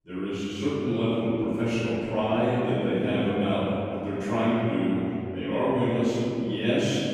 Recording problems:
room echo; strong; dies away in 2.7 s
off-mic speech; far

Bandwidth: 15 kHz